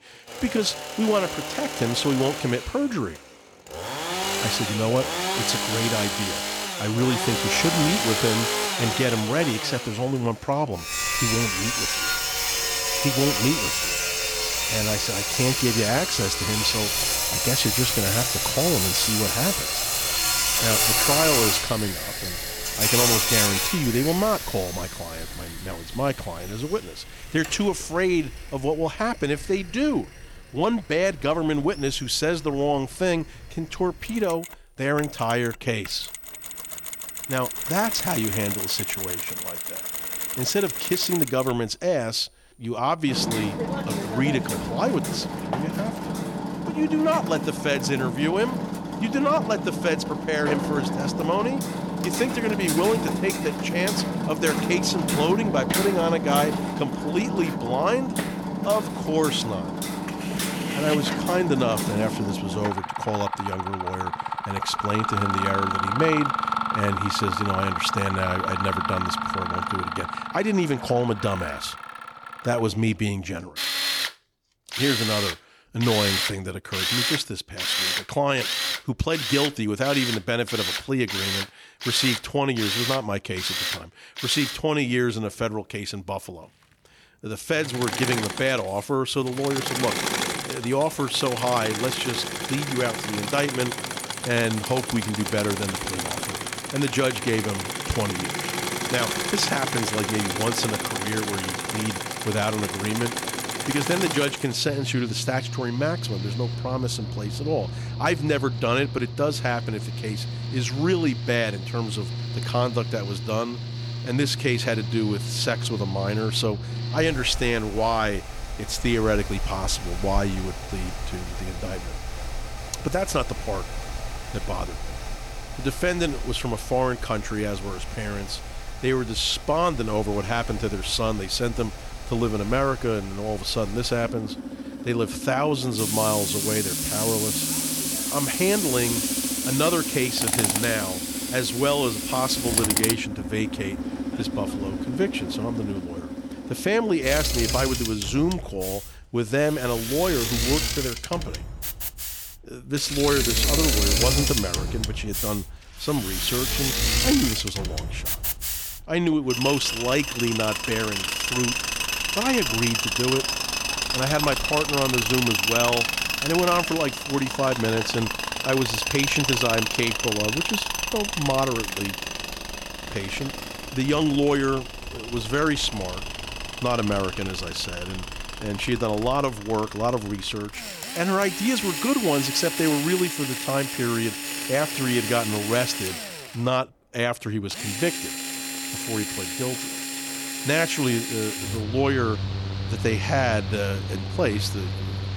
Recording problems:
machinery noise; loud; throughout; 1 dB below the speech

